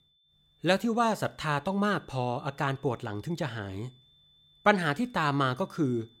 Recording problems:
high-pitched whine; faint; throughout; 3.5 kHz, 30 dB below the speech

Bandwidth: 16 kHz